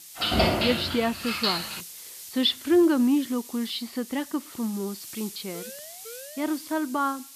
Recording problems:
high frequencies cut off; noticeable; nothing above 5 kHz
hiss; noticeable; throughout; 15 dB below the speech
jangling keys; loud; until 2 s; peak 5 dB above the speech
siren; faint; from 5.5 to 6.5 s; peak 15 dB below the speech

